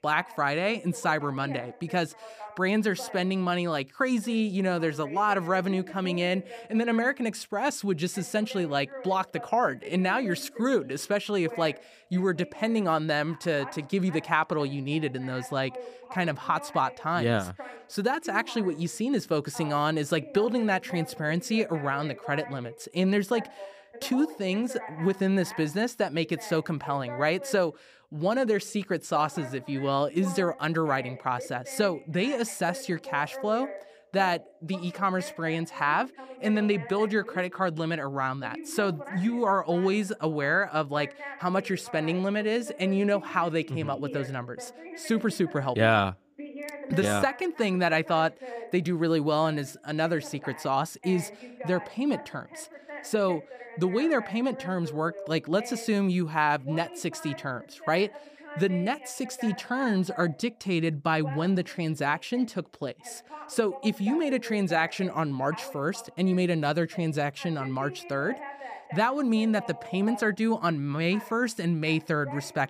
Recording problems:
voice in the background; noticeable; throughout; 15 dB below the speech

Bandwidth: 15 kHz